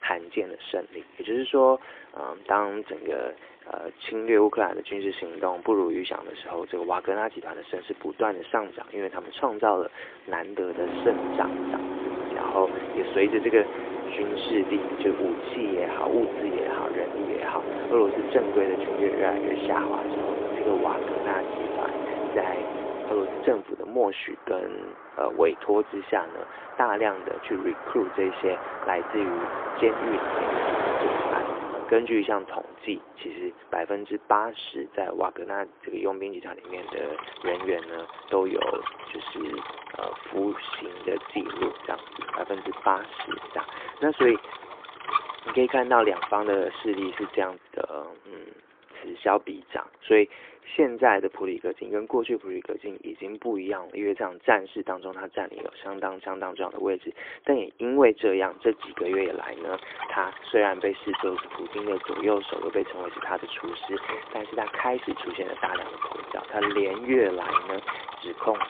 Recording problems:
phone-call audio; poor line
traffic noise; loud; throughout; 5 dB below the speech

